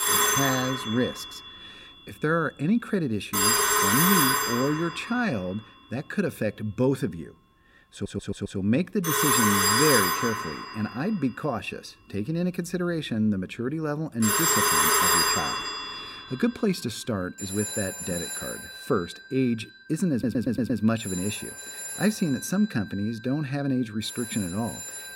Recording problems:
alarms or sirens; very loud; throughout; 4 dB above the speech
audio stuttering; at 8 s and at 20 s

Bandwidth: 16 kHz